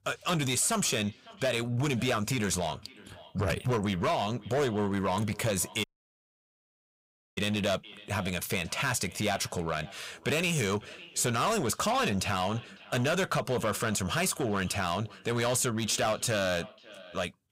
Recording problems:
echo of what is said; faint; throughout; 550 ms later, 20 dB below the speech
distortion; slight; 11% of the sound clipped
audio cutting out; at 6 s for 1.5 s

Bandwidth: 15.5 kHz